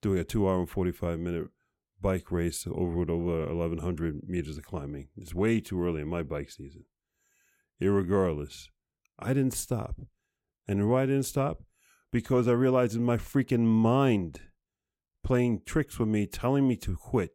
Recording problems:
none

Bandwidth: 16.5 kHz